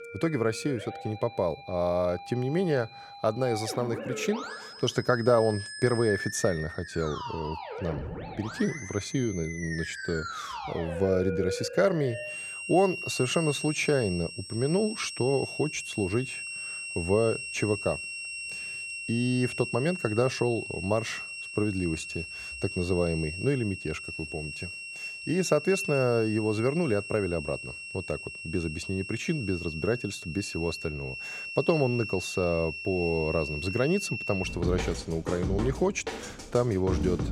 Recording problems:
background music; loud; throughout; 7 dB below the speech

